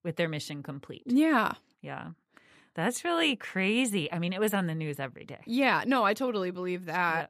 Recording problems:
none

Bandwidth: 14.5 kHz